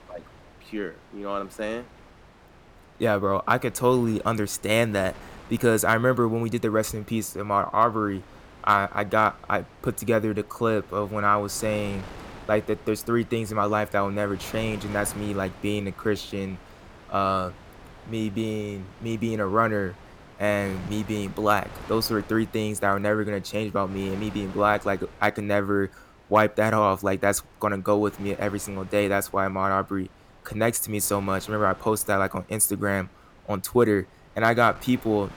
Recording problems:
wind noise on the microphone; occasional gusts; 20 dB below the speech

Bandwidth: 17 kHz